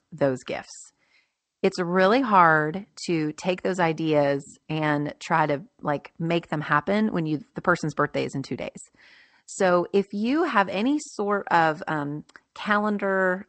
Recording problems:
garbled, watery; slightly; nothing above 8 kHz

